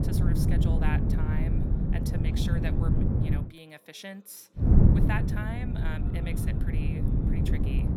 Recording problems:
wind noise on the microphone; heavy; until 3.5 s and from 4.5 s on; 3 dB above the speech
voice in the background; faint; throughout; 20 dB below the speech

